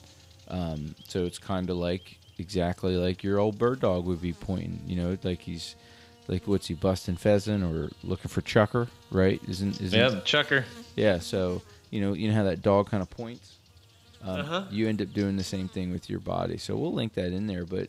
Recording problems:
electrical hum; faint; throughout; 50 Hz, 20 dB below the speech

